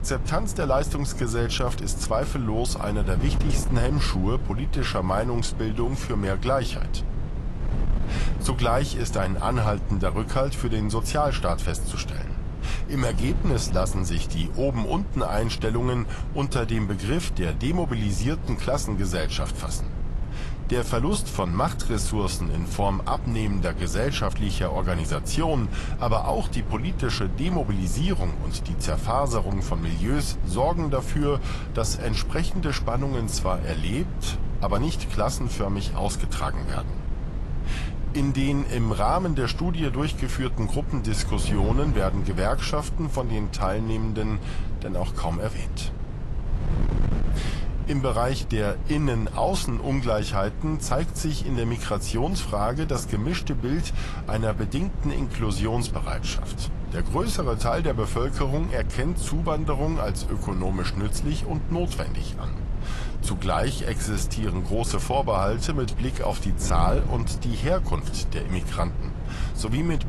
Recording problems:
garbled, watery; slightly; nothing above 11.5 kHz
wind noise on the microphone; occasional gusts; 15 dB below the speech

